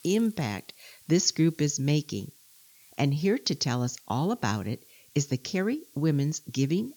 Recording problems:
high frequencies cut off; noticeable; nothing above 7 kHz
hiss; faint; throughout; 25 dB below the speech

